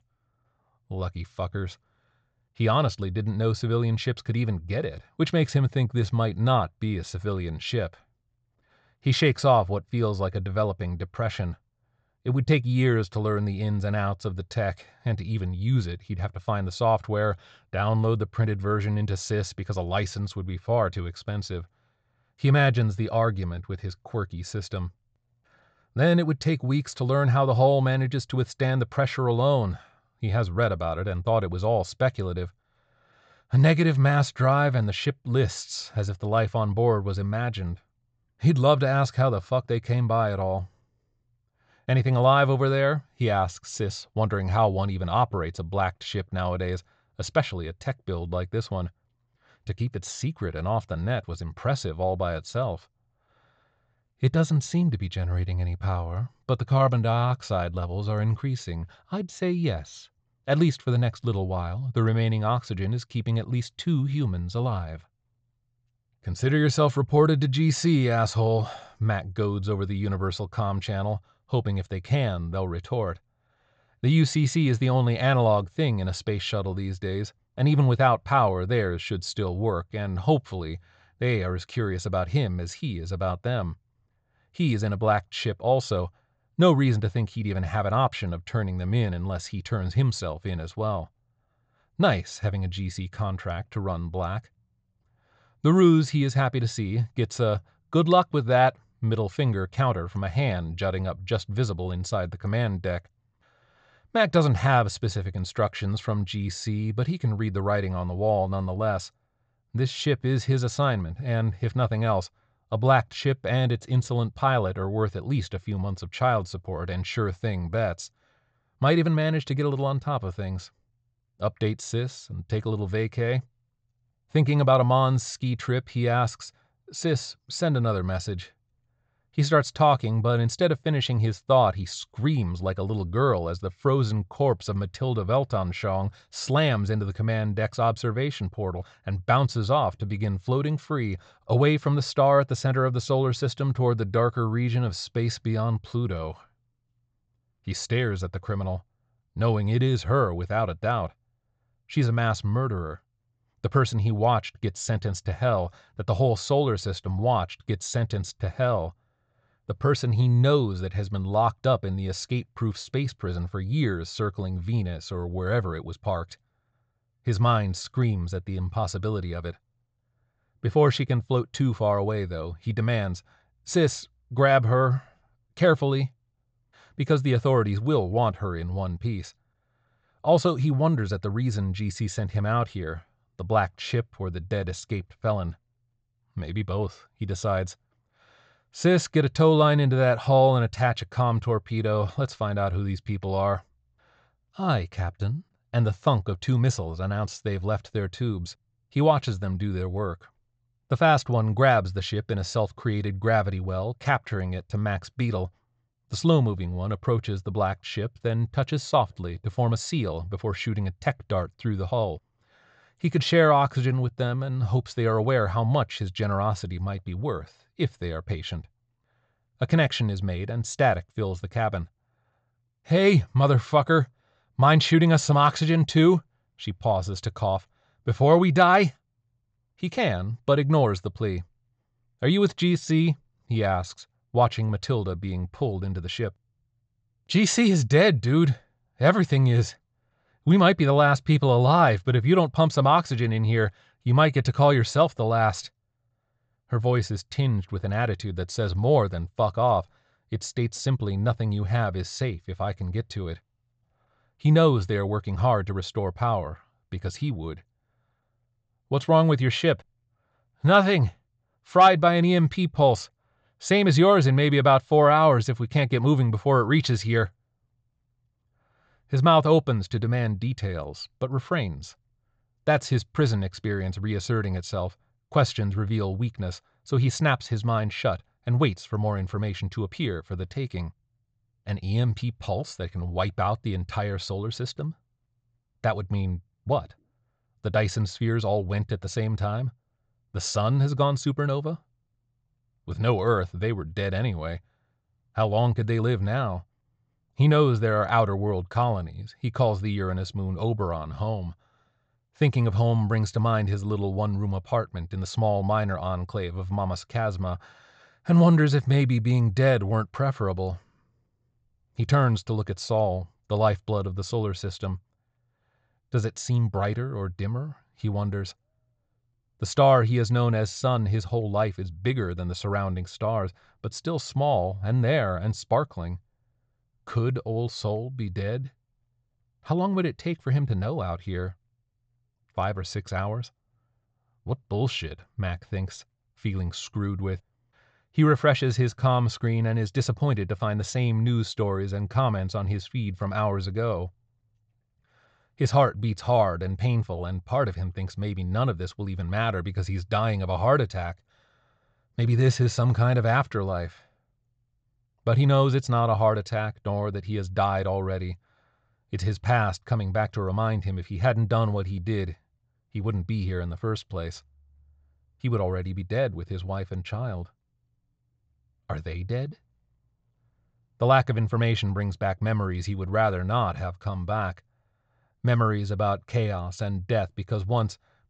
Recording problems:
high frequencies cut off; noticeable; nothing above 8 kHz

